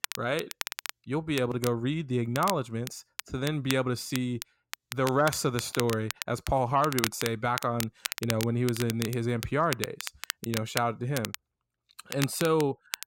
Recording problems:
crackle, like an old record; loud; 8 dB below the speech

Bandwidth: 16 kHz